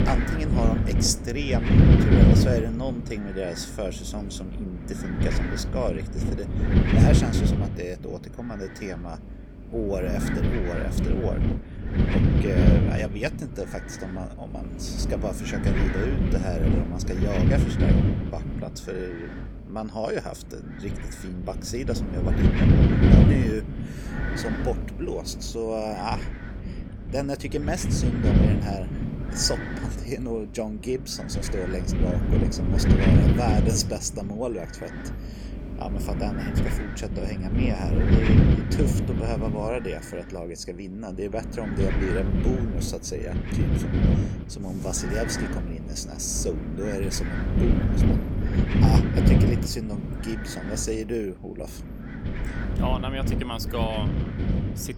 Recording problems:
wind noise on the microphone; heavy; as loud as the speech

